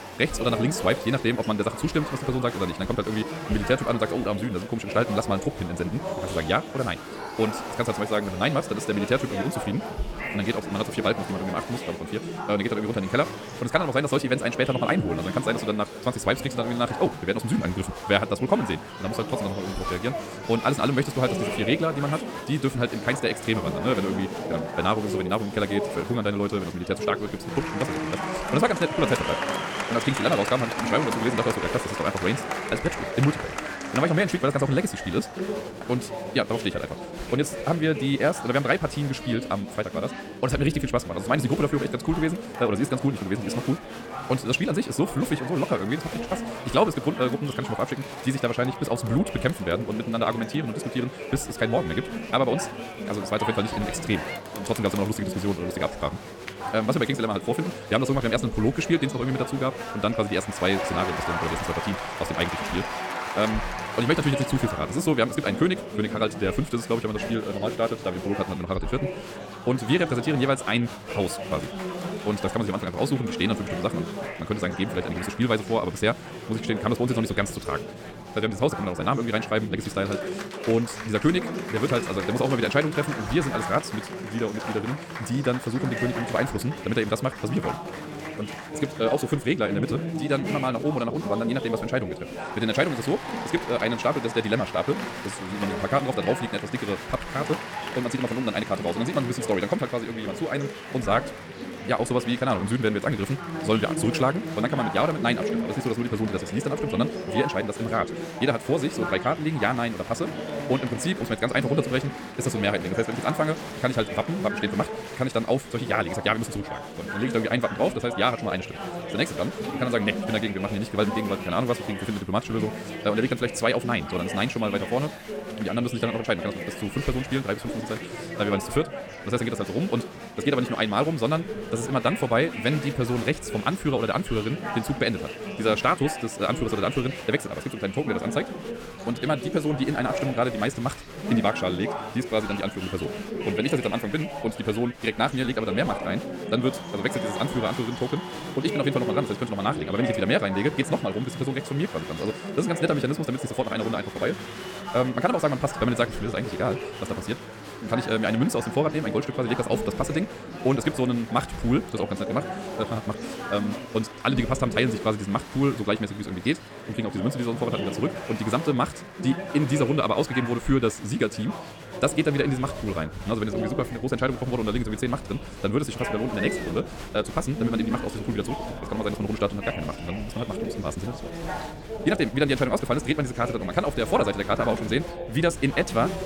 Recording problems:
wrong speed, natural pitch; too fast; 1.7 times normal speed
chatter from many people; loud; throughout; 7 dB below the speech

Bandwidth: 17.5 kHz